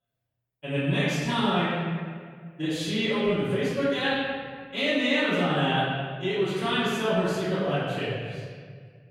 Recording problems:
room echo; strong; dies away in 1.8 s
off-mic speech; far

